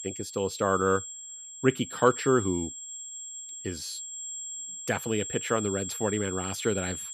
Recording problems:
high-pitched whine; loud; throughout; 7.5 kHz, 8 dB below the speech

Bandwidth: 14.5 kHz